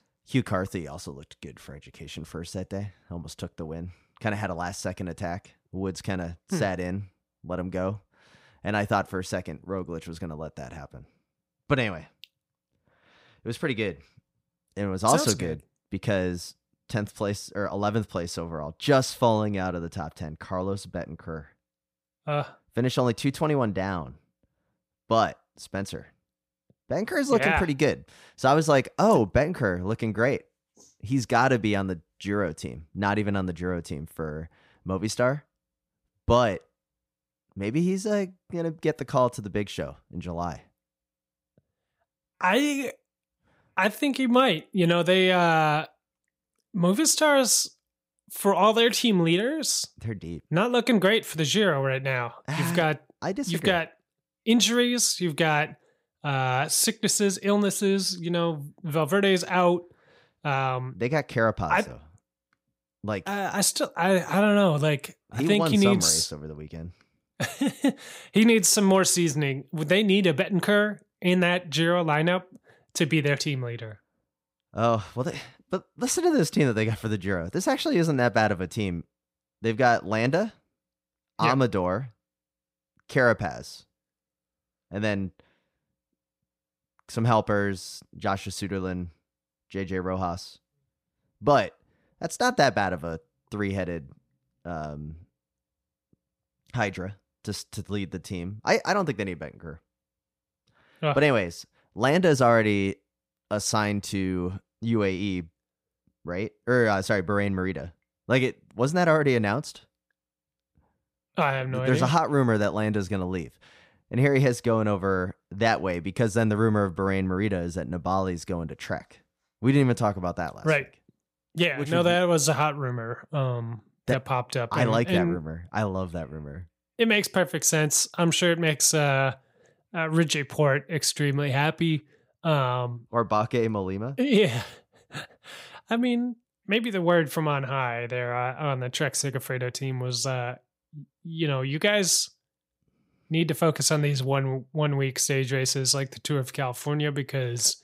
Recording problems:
none

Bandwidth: 15.5 kHz